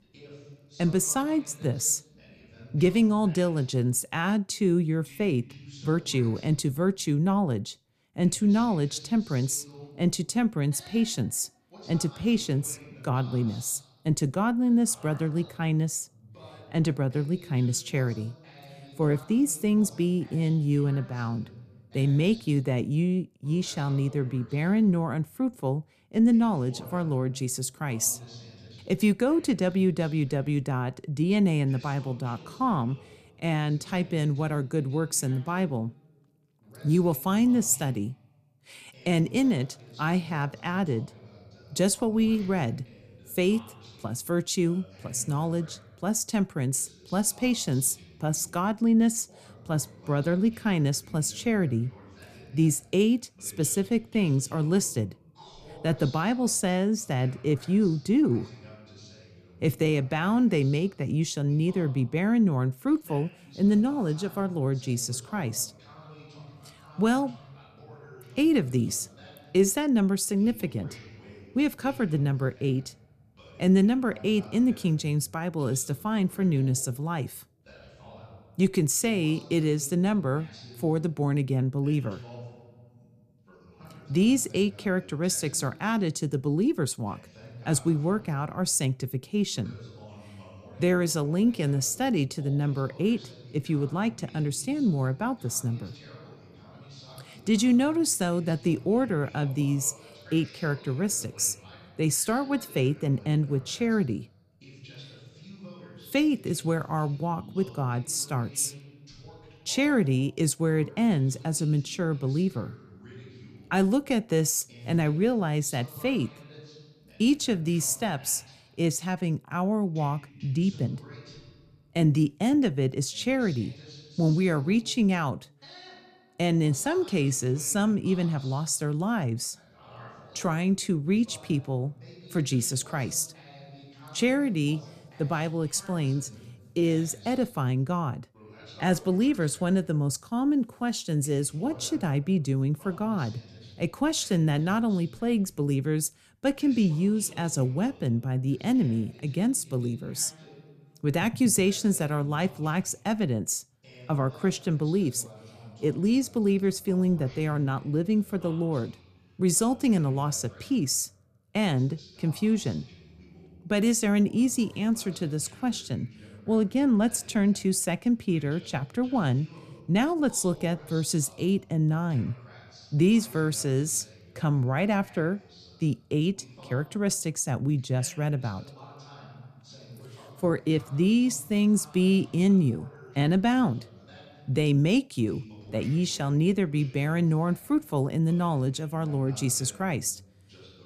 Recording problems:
voice in the background; faint; throughout; 20 dB below the speech

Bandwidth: 14.5 kHz